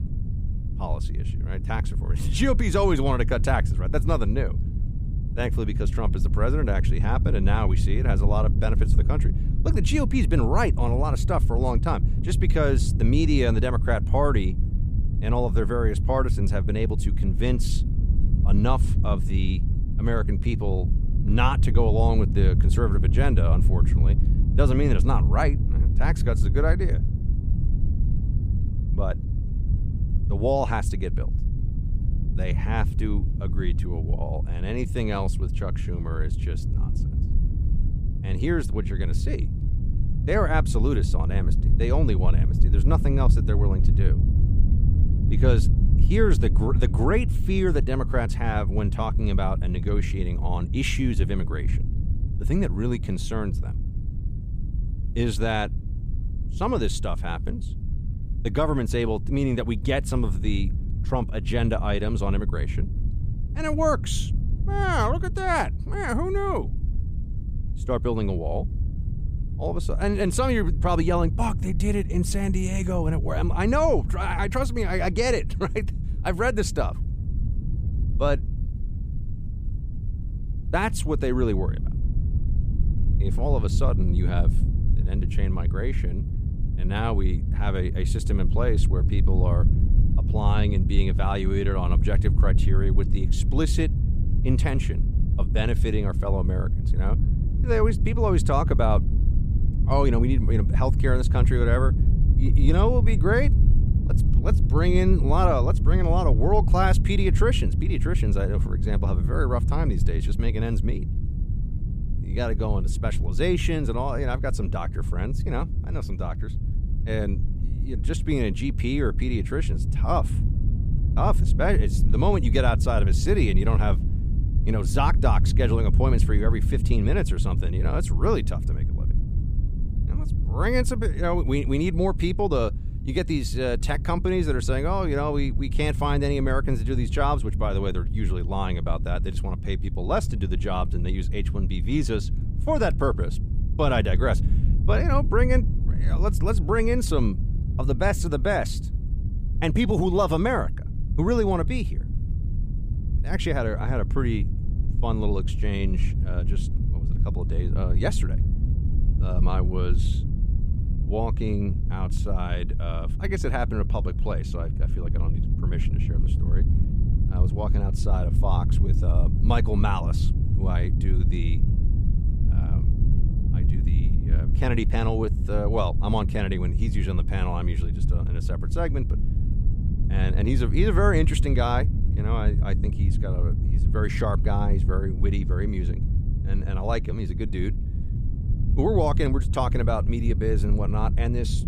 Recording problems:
low rumble; noticeable; throughout; 10 dB below the speech

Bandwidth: 15 kHz